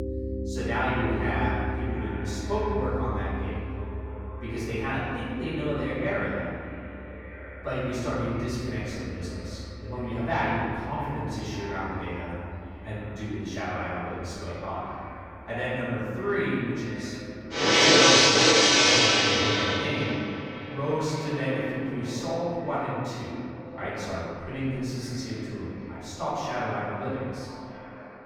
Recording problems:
room echo; strong; dies away in 2.1 s
off-mic speech; far
echo of what is said; noticeable; throughout; 600 ms later, 15 dB below the speech
background music; very loud; throughout; 9 dB above the speech

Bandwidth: 18 kHz